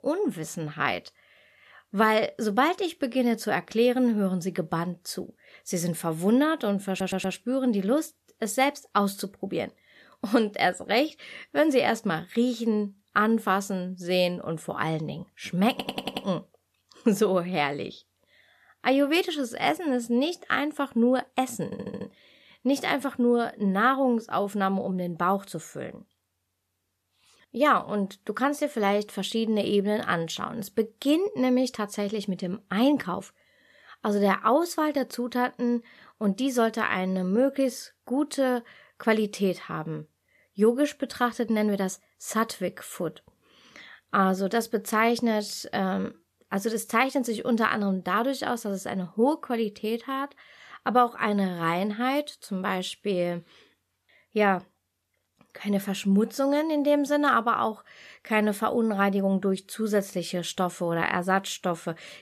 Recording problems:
audio stuttering; at 7 s, at 16 s and at 22 s

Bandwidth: 14.5 kHz